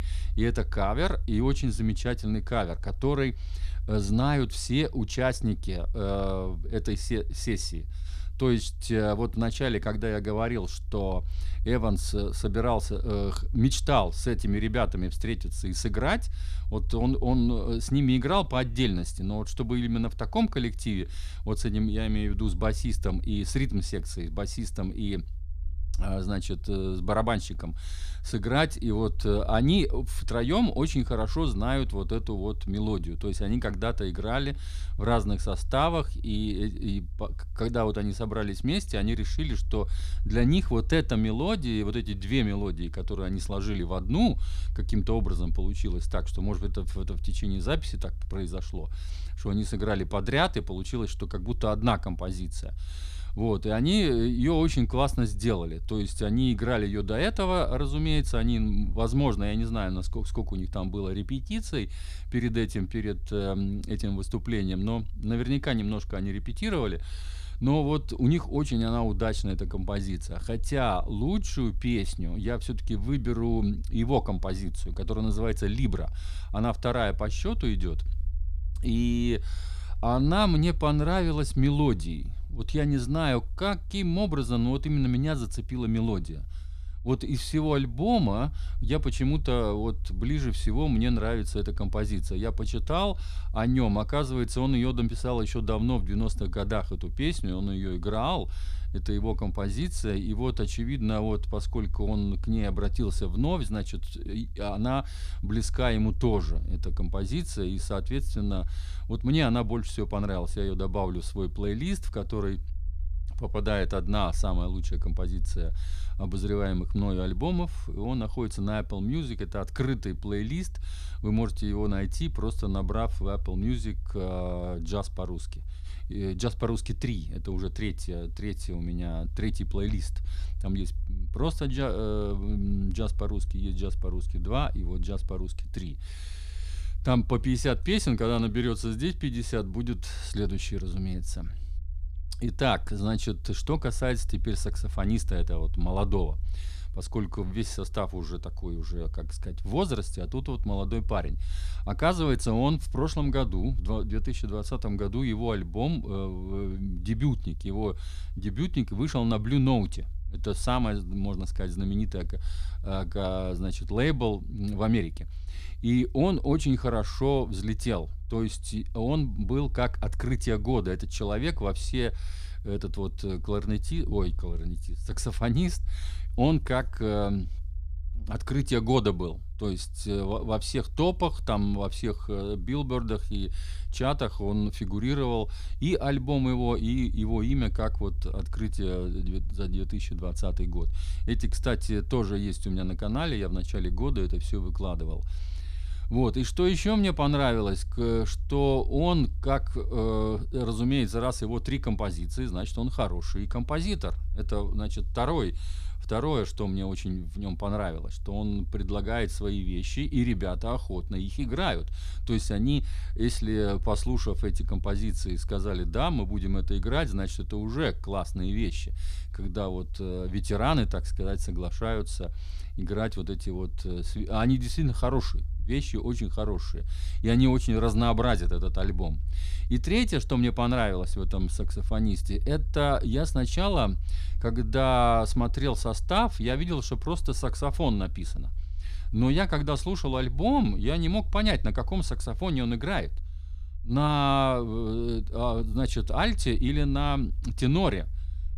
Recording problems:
low rumble; faint; throughout; 25 dB below the speech

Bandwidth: 14.5 kHz